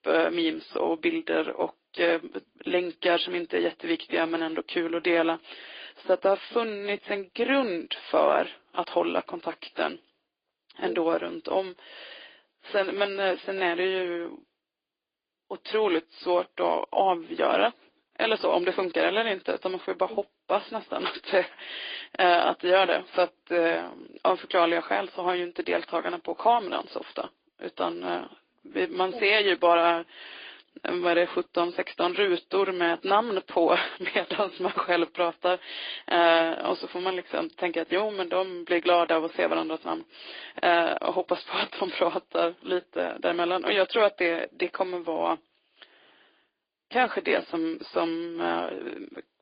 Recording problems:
thin; very; fading below 300 Hz
high frequencies cut off; severe; nothing above 5 kHz
garbled, watery; slightly

